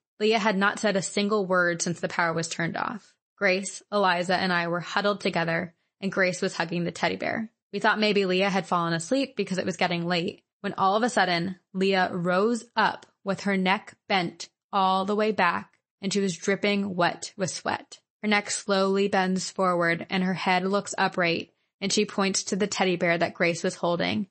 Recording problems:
garbled, watery; slightly; nothing above 8 kHz

